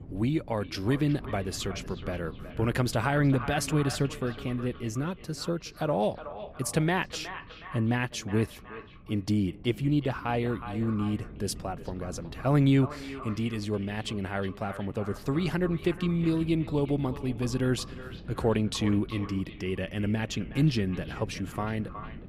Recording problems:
echo of what is said; noticeable; throughout; 370 ms later, 15 dB below the speech
wind noise on the microphone; occasional gusts; 20 dB below the speech

